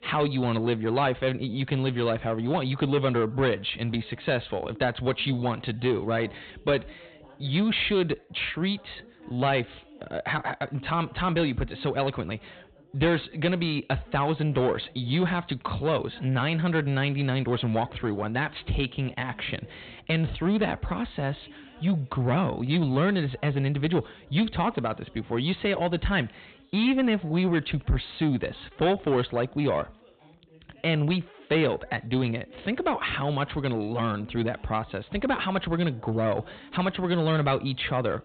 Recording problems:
high frequencies cut off; severe; nothing above 4 kHz
distortion; slight; 10 dB below the speech
background chatter; faint; throughout; 3 voices, 25 dB below the speech

